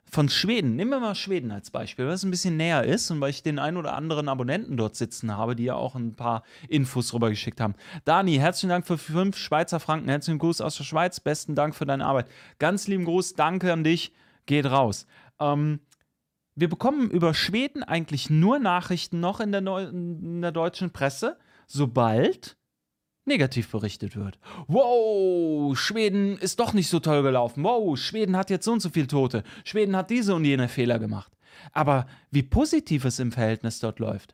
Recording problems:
none

